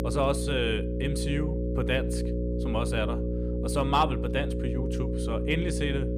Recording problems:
electrical hum; loud; throughout; 60 Hz, 6 dB below the speech

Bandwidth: 15 kHz